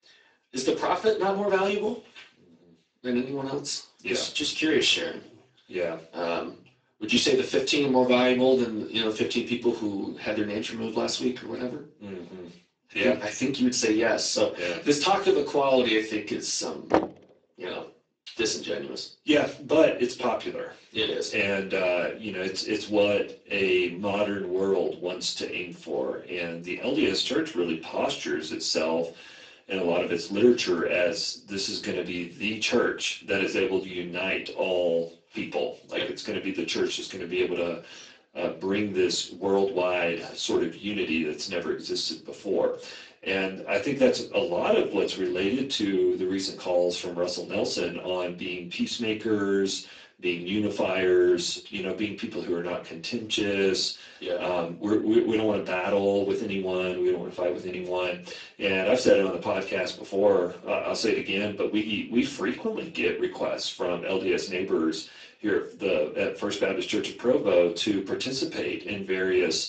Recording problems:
off-mic speech; far
garbled, watery; badly; nothing above 7.5 kHz
room echo; slight; dies away in 0.3 s
thin; very slightly; fading below 300 Hz
door banging; loud; at 17 s; peak 1 dB above the speech

